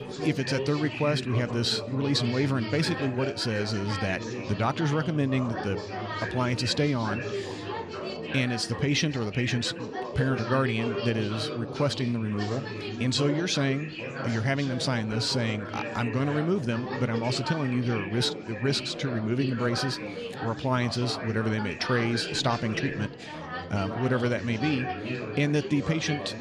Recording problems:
chatter from many people; loud; throughout; 7 dB below the speech

